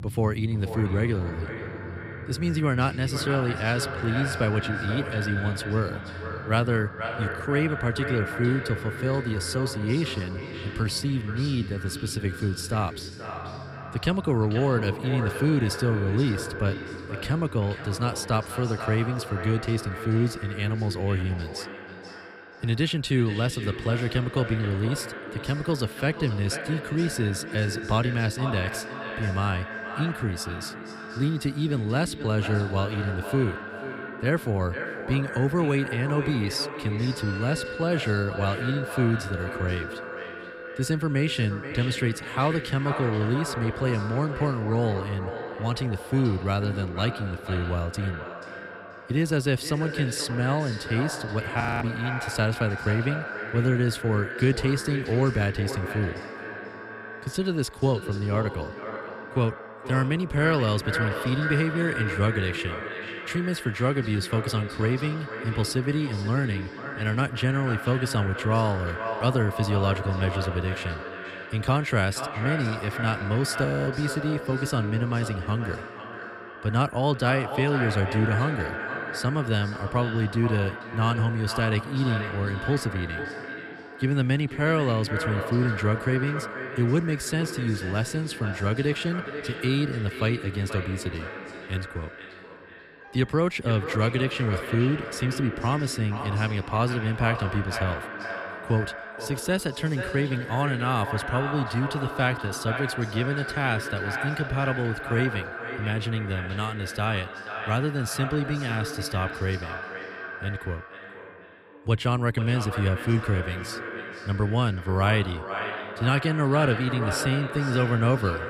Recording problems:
echo of what is said; strong; throughout; 480 ms later, 8 dB below the speech
background music; noticeable; throughout; 20 dB below the speech
audio freezing; at 52 s and at 1:14

